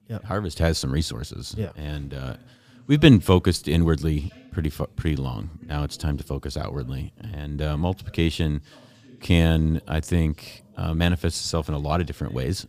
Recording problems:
voice in the background; faint; throughout; 30 dB below the speech

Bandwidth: 15 kHz